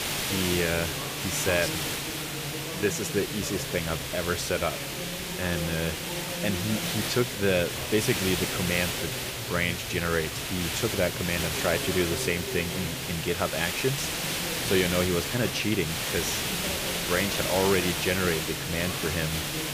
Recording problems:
voice in the background; loud; throughout; 10 dB below the speech
hiss; loud; throughout; 1 dB below the speech

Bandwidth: 15 kHz